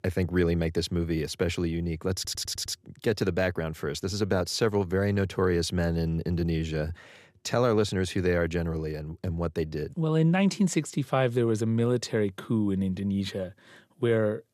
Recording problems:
audio stuttering; at 2 s

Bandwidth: 14.5 kHz